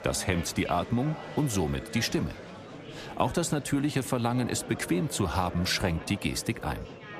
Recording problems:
murmuring crowd; noticeable; throughout; 15 dB below the speech

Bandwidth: 14.5 kHz